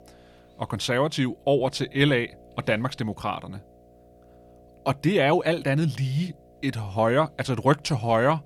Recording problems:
electrical hum; faint; throughout; 60 Hz, 30 dB below the speech

